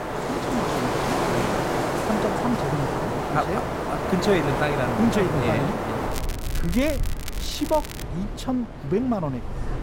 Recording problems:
wind in the background; loud; throughout; as loud as the speech
crackling; noticeable; from 6 to 8 s; 10 dB below the speech

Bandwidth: 16 kHz